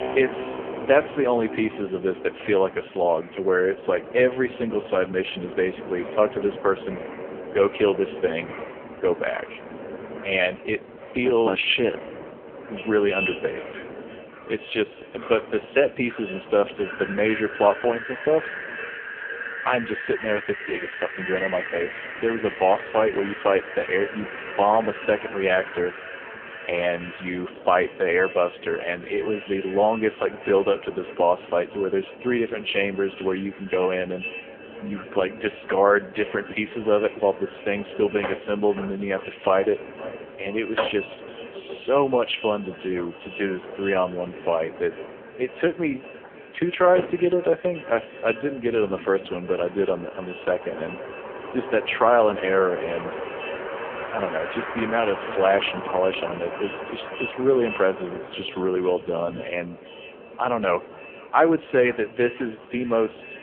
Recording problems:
phone-call audio; poor line; nothing above 3.5 kHz
echo of what is said; noticeable; from 13 s on; 500 ms later, 15 dB below the speech
wind in the background; noticeable; throughout; 10 dB below the speech
background music; faint; throughout; 20 dB below the speech

